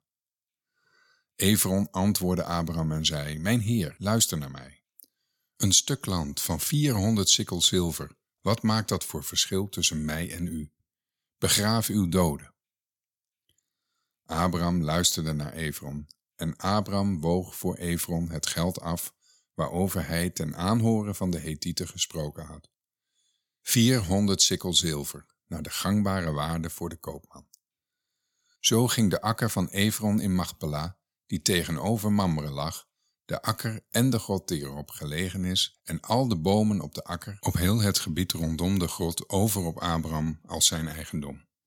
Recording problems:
none

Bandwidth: 17 kHz